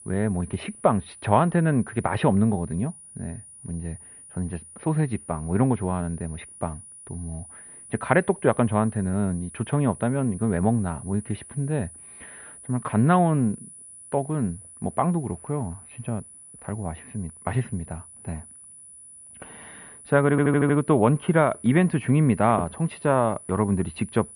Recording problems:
muffled; very; fading above 2.5 kHz
high-pitched whine; noticeable; throughout; 10 kHz, 20 dB below the speech
audio stuttering; at 20 s

